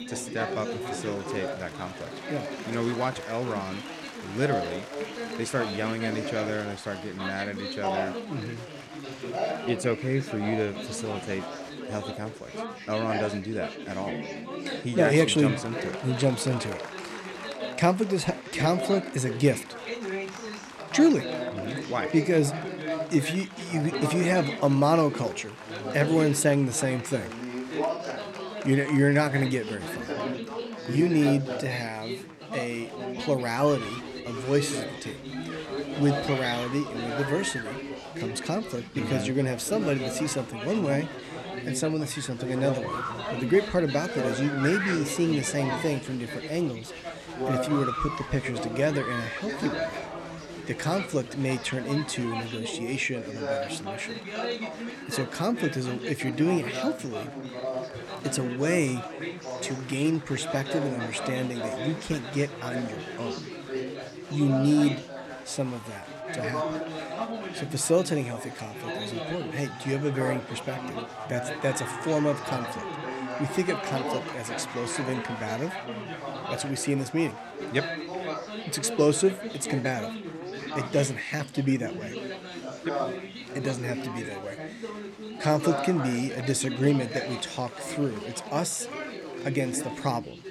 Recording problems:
chatter from many people; loud; throughout; 6 dB below the speech

